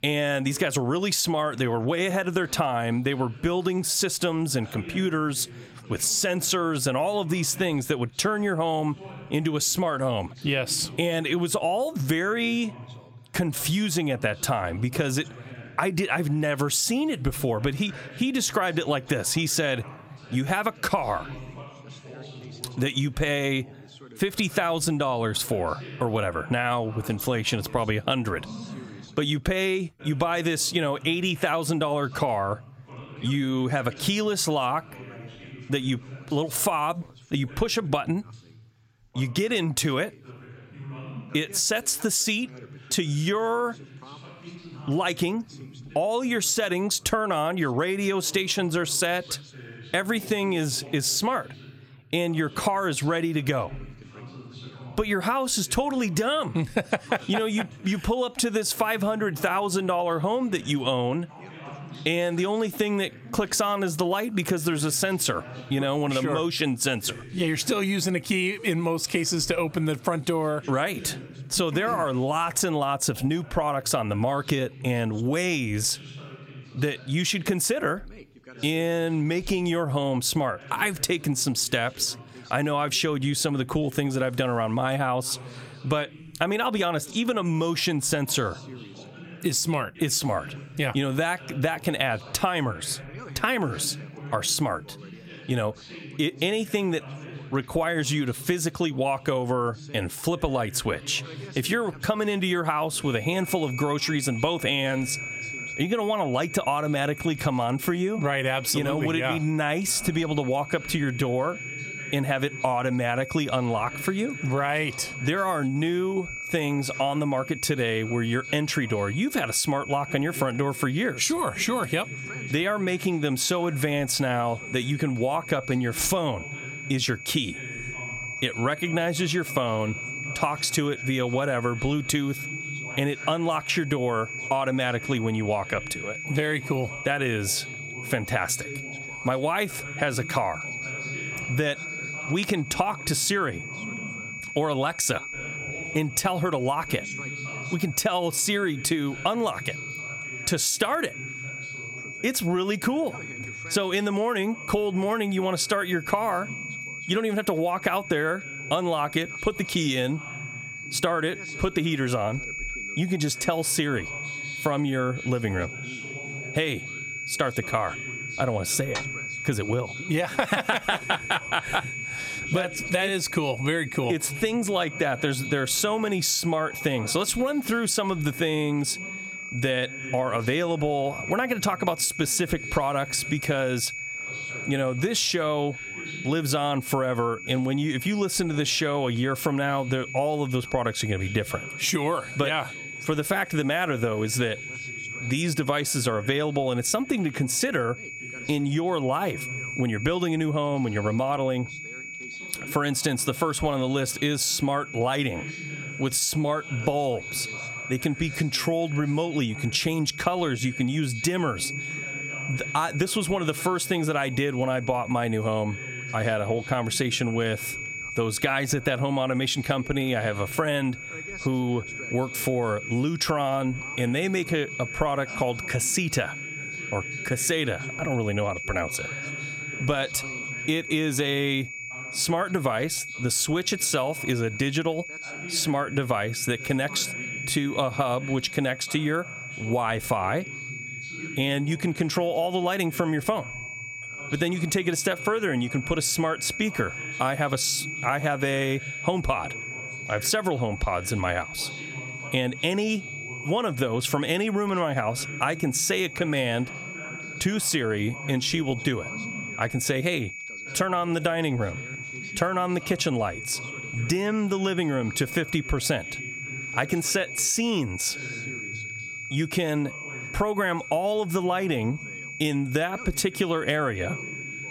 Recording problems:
squashed, flat; somewhat, background pumping
high-pitched whine; noticeable; from 1:43 on; 2.5 kHz, 10 dB below the speech
background chatter; noticeable; throughout; 2 voices, 20 dB below the speech

